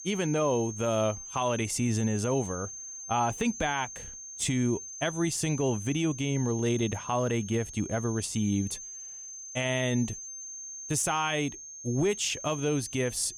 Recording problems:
high-pitched whine; loud; throughout; 6.5 kHz, 10 dB below the speech

